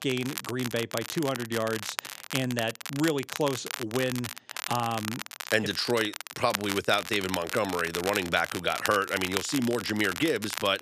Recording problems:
crackle, like an old record; loud; 7 dB below the speech

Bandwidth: 14.5 kHz